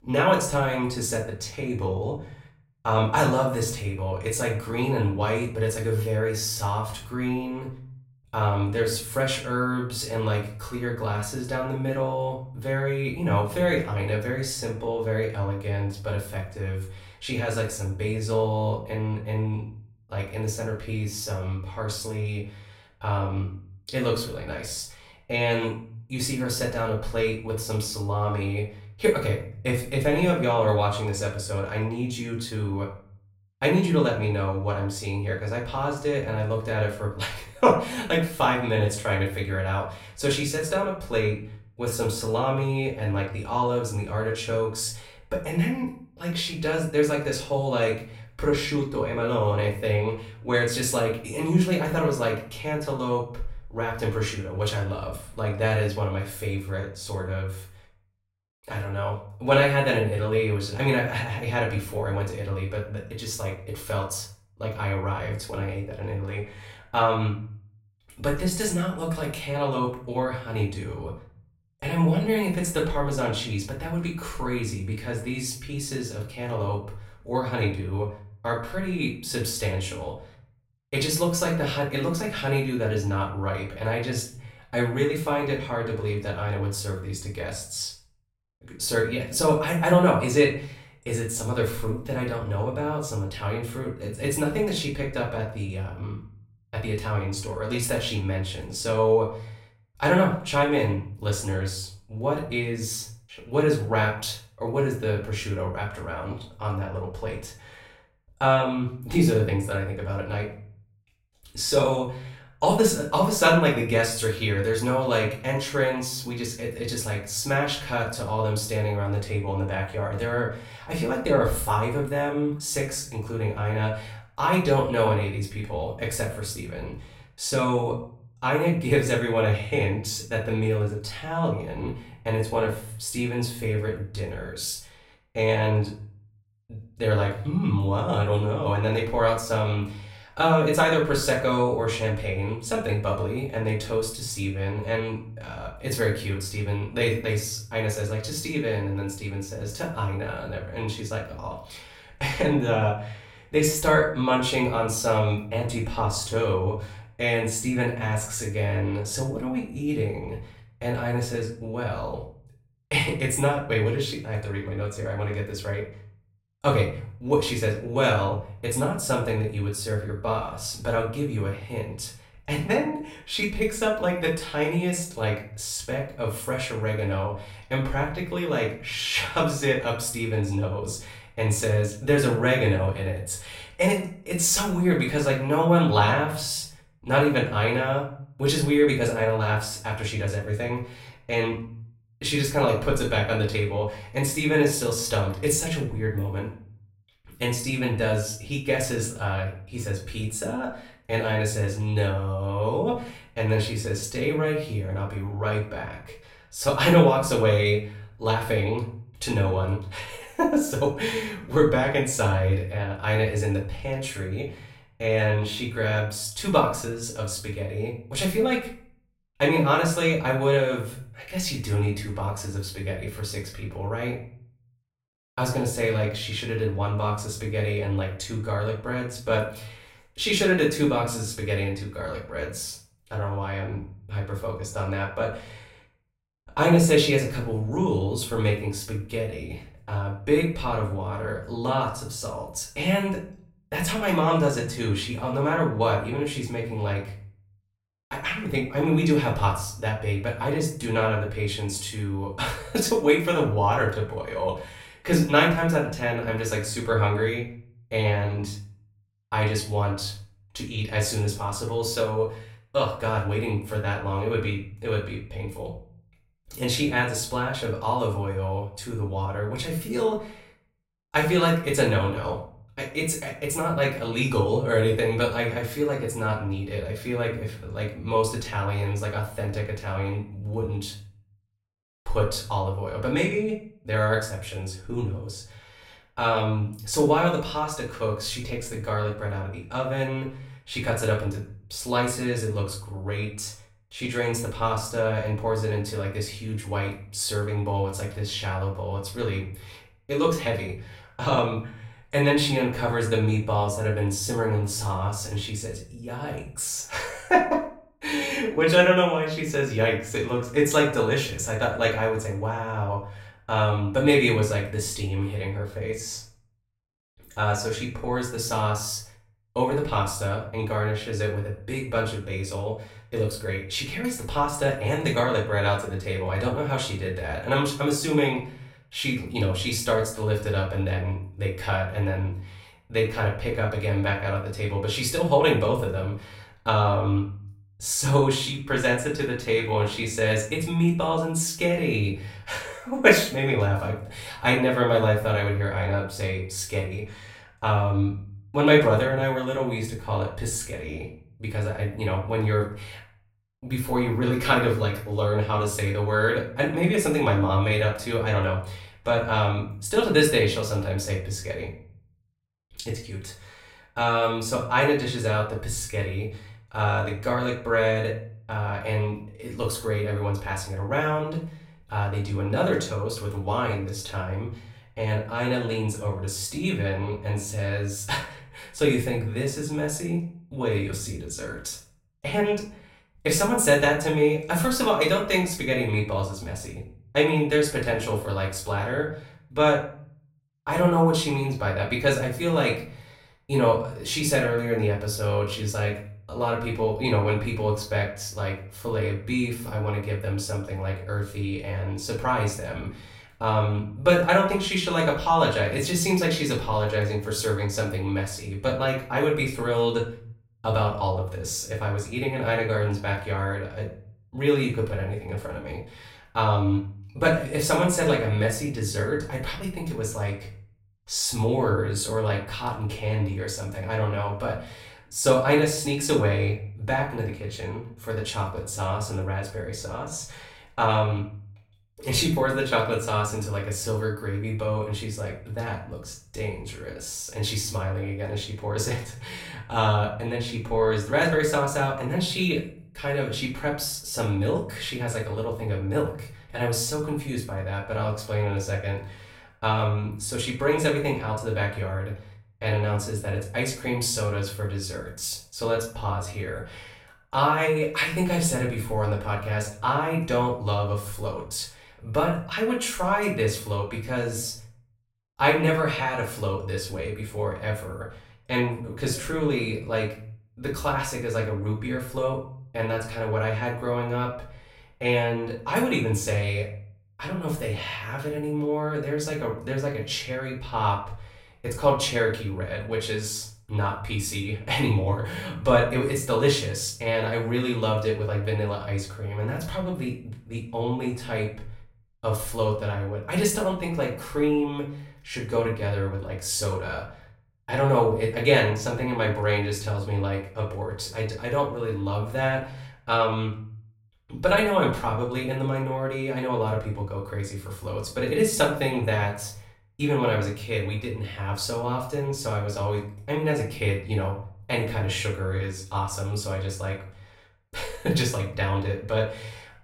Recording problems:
off-mic speech; far
room echo; slight; dies away in 0.4 s

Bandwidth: 16 kHz